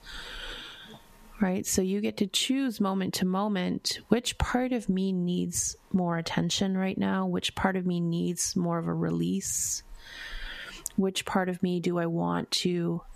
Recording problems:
squashed, flat; heavily

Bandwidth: 14.5 kHz